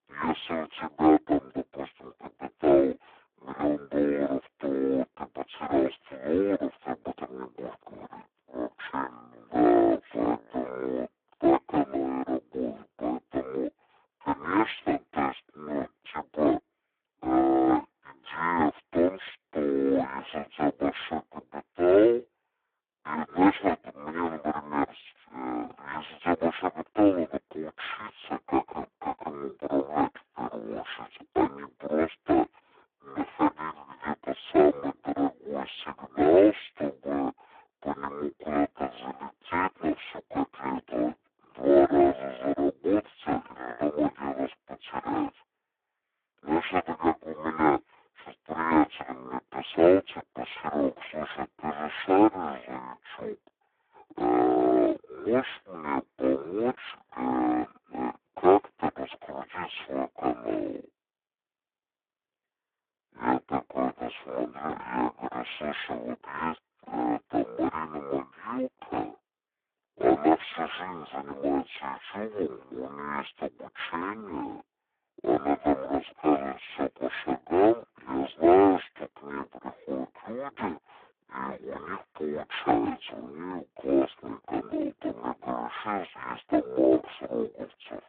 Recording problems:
phone-call audio; poor line
wrong speed and pitch; too slow and too low; 0.5 times normal speed

